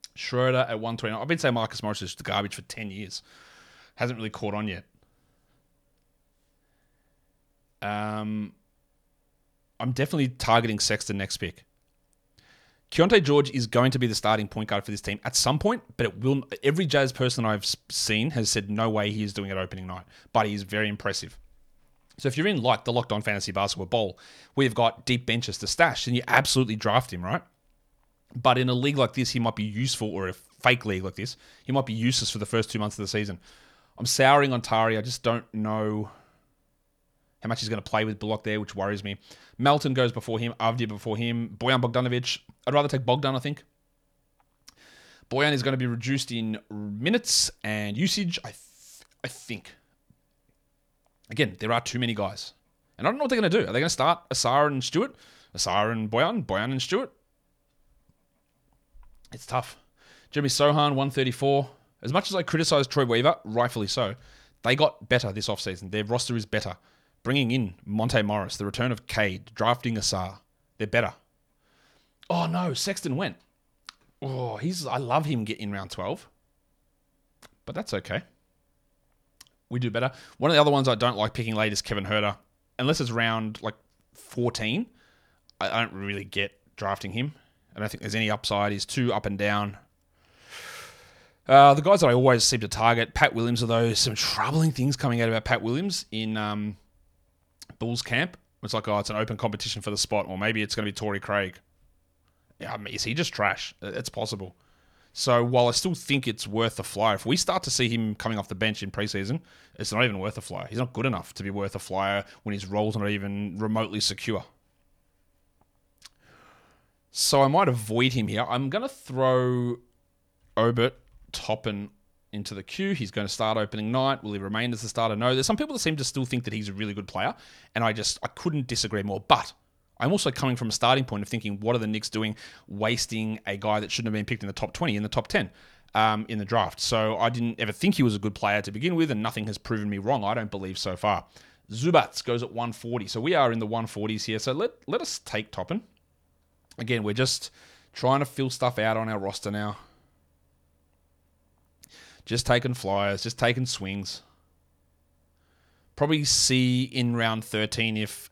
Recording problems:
none

